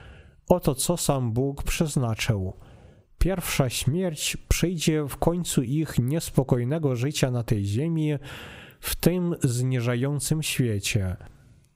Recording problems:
squashed, flat; somewhat

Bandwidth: 15.5 kHz